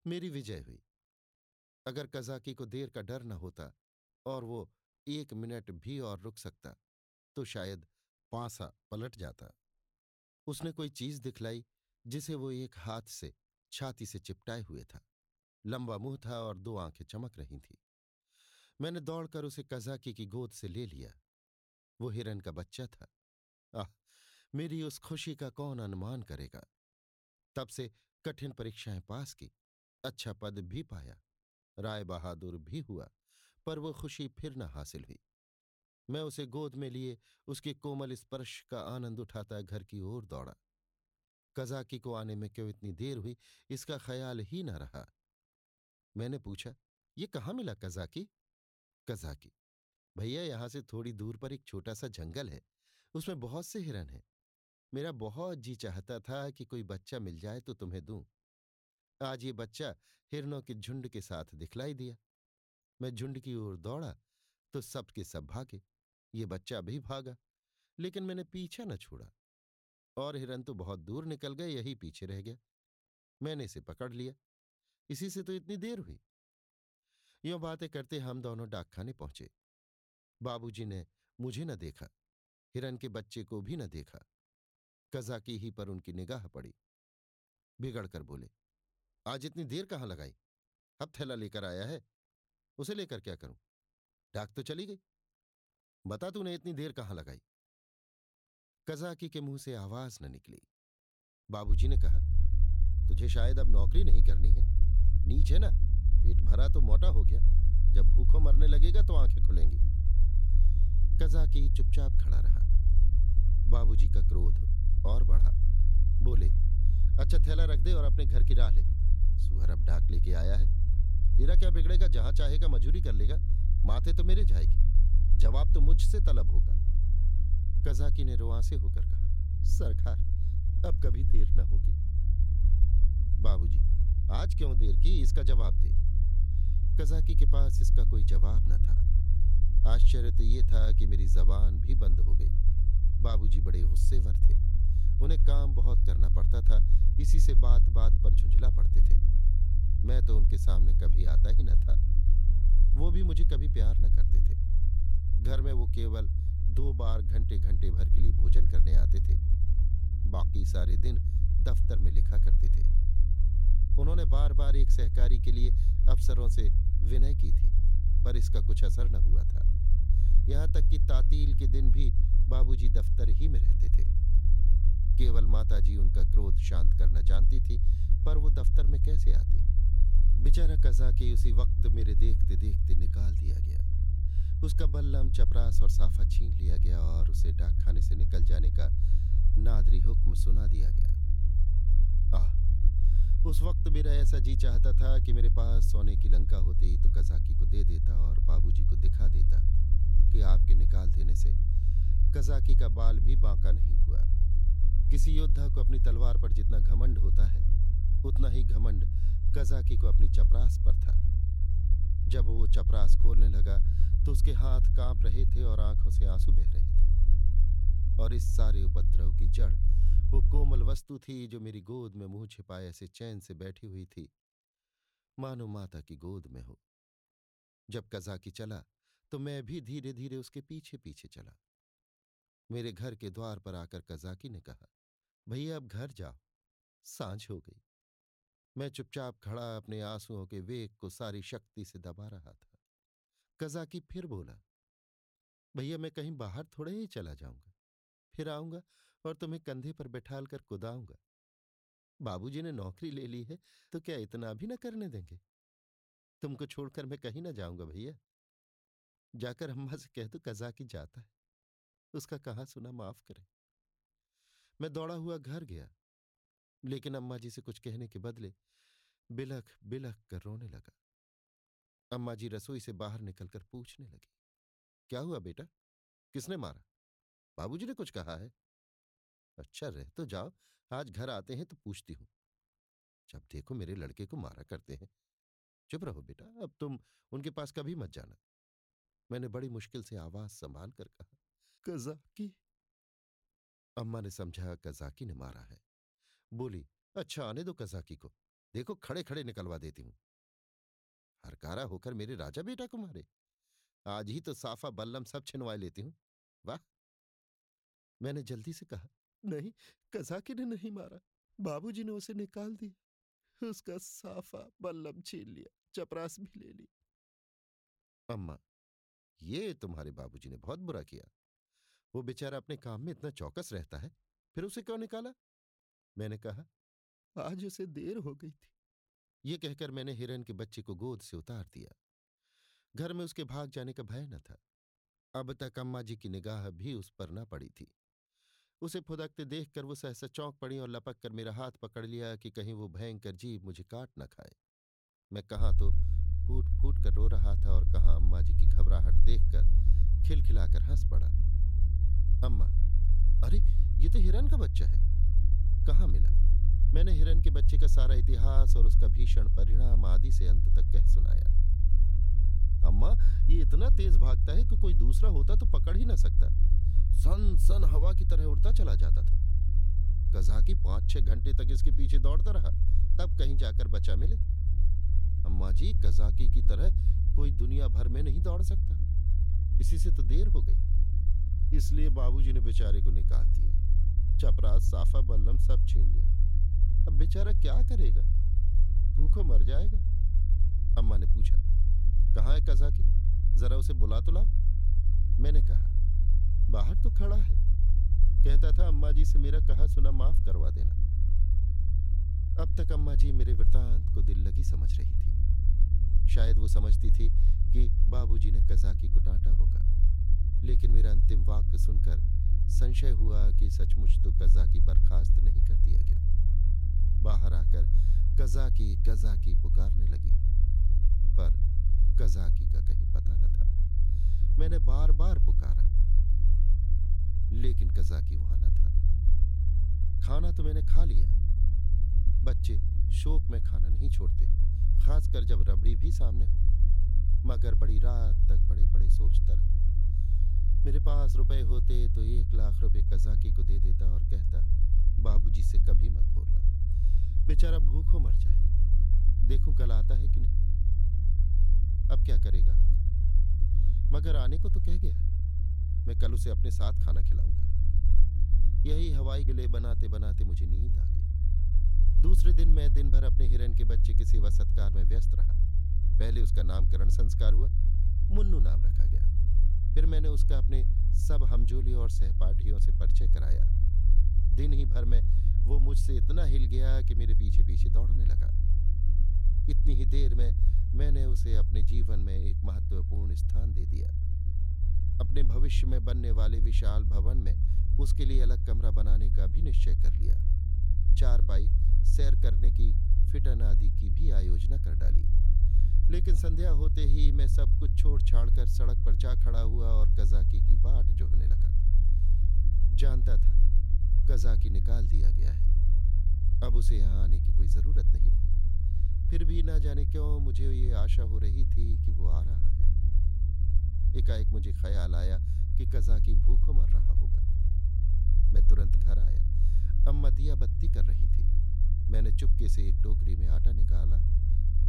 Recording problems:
low rumble; loud; from 1:42 to 3:41 and from 5:46 on; 4 dB below the speech

